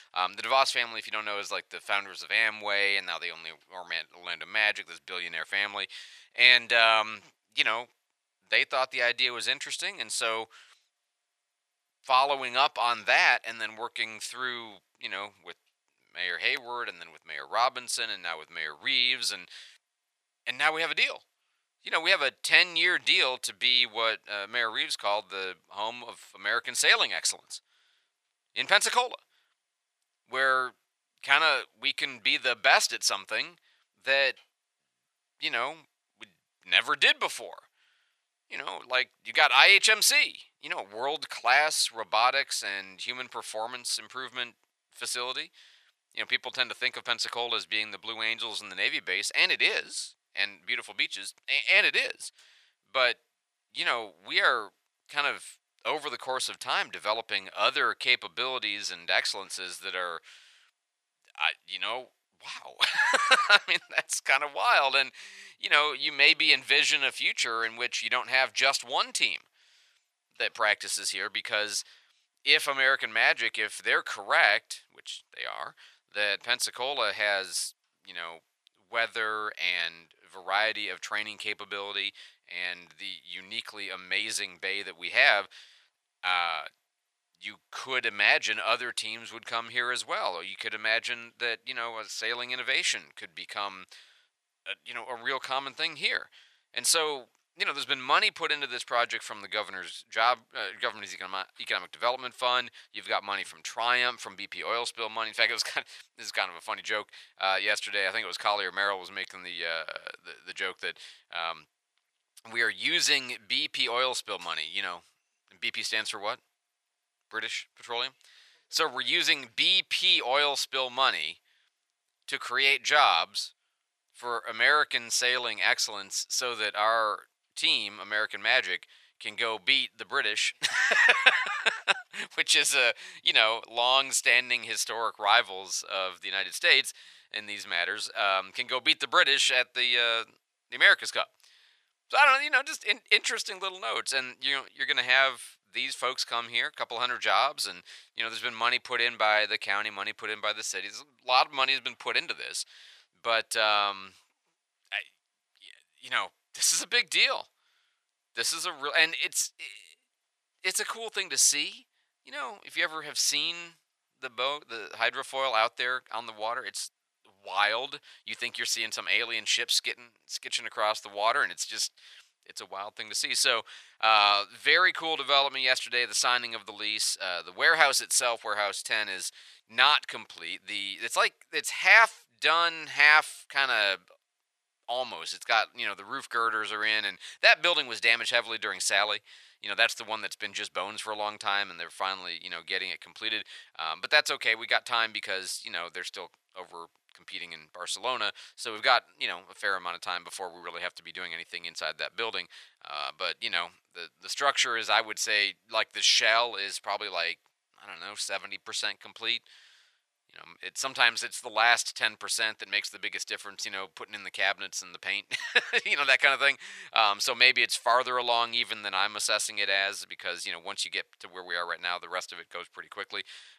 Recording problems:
thin; very; fading below 900 Hz

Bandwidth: 13.5 kHz